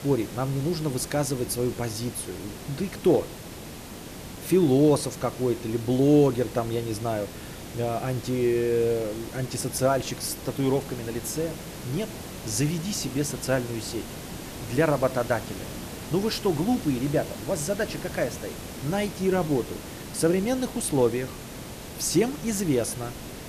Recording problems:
hiss; noticeable; throughout; 10 dB below the speech

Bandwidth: 14.5 kHz